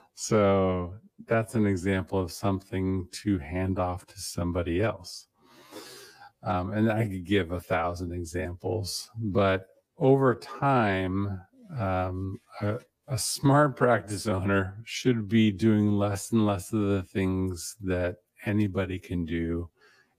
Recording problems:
wrong speed, natural pitch; too slow; 0.7 times normal speed

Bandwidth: 15 kHz